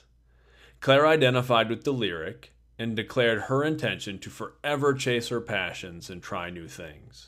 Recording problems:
none

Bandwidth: 15.5 kHz